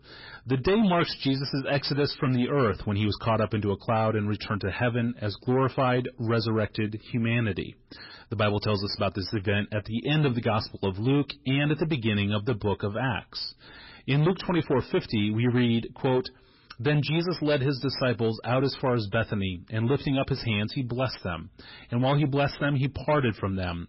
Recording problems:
garbled, watery; badly; nothing above 5.5 kHz
distortion; slight; 10 dB below the speech

